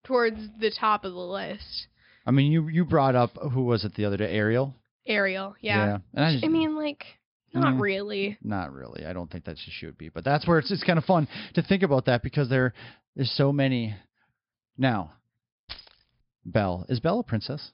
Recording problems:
high frequencies cut off; noticeable; nothing above 5.5 kHz
jangling keys; faint; at 16 s; peak 15 dB below the speech

